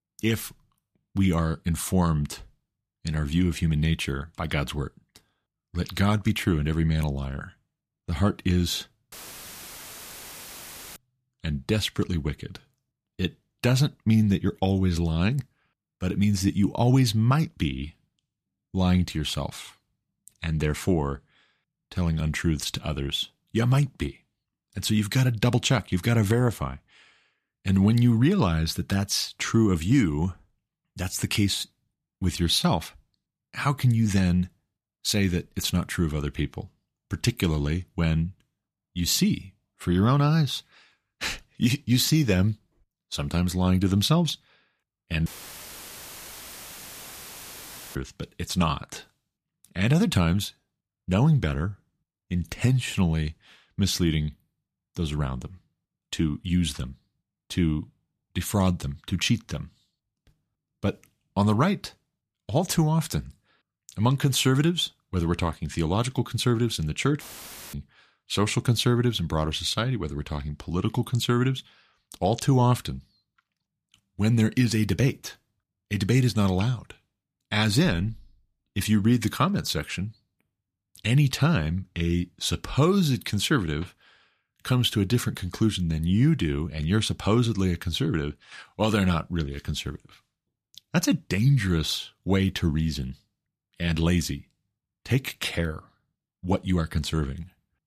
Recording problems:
audio cutting out; filled with static; at 9 s for 2 s, at 45 s for 2.5 s and at 1:07 for 0.5 s

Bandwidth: 14.5 kHz